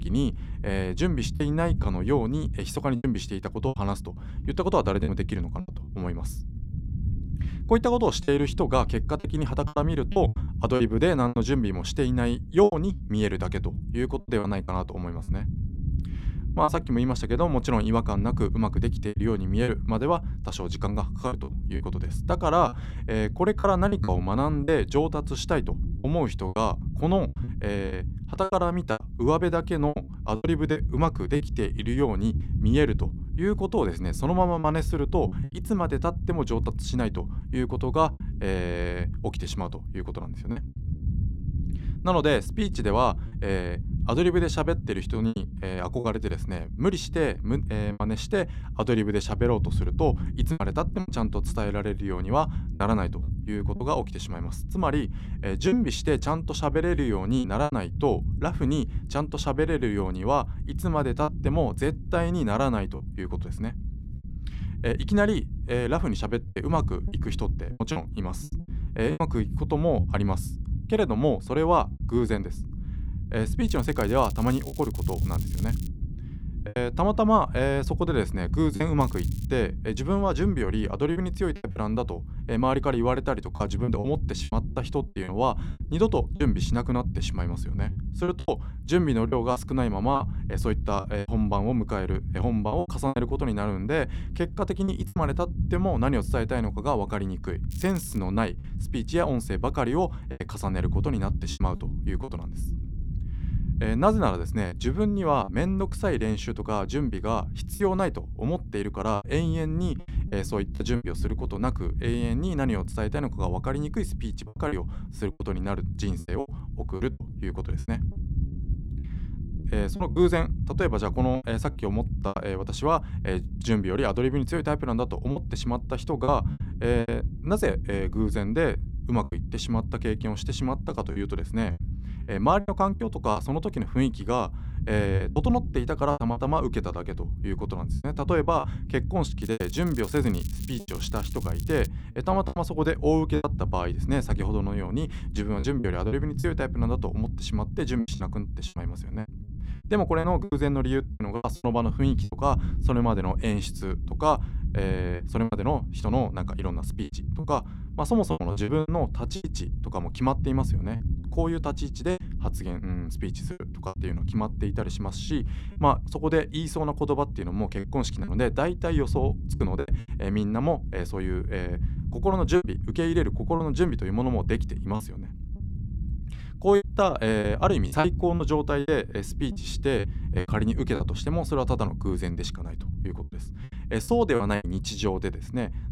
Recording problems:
low rumble; noticeable; throughout; 20 dB below the speech
crackling; noticeable; 4 times, first at 1:14; 20 dB below the speech
choppy; very; 7% of the speech affected

